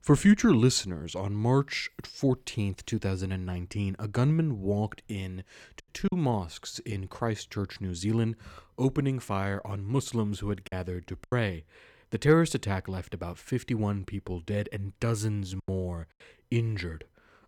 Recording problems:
choppy; occasionally; 2% of the speech affected

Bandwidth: 18 kHz